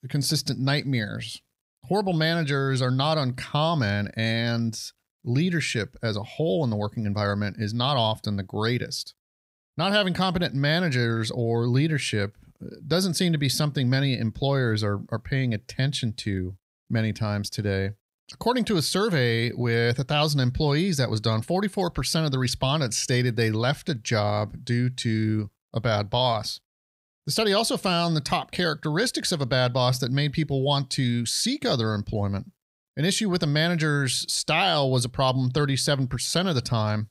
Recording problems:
none

